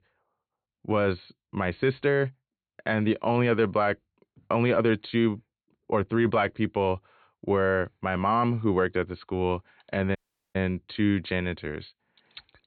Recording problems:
high frequencies cut off; severe; nothing above 4.5 kHz
audio cutting out; at 10 s

